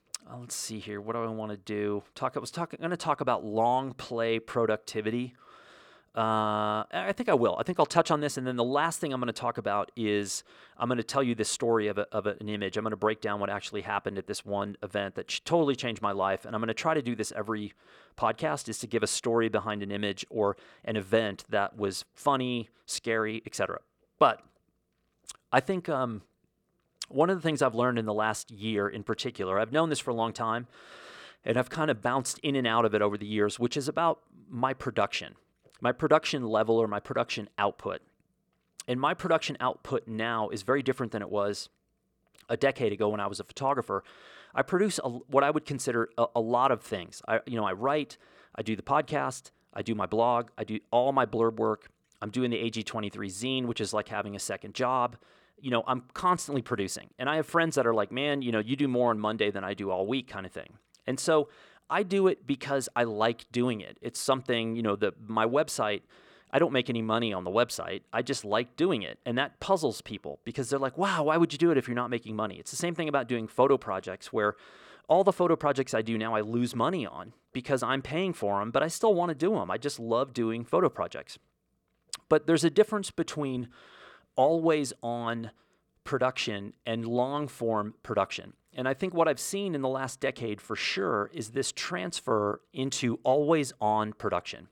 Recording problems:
none

